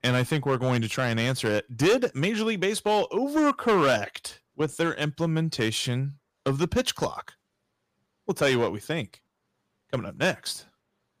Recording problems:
distortion; slight; 4% of the sound clipped

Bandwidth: 15 kHz